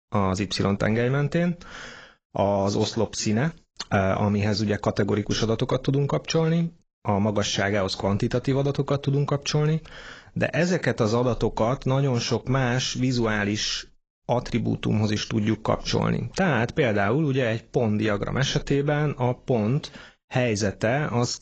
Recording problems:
garbled, watery; badly

